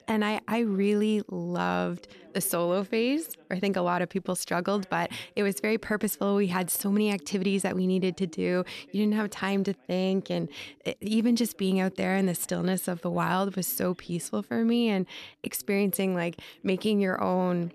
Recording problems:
background chatter; faint; throughout; 2 voices, 25 dB below the speech

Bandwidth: 13.5 kHz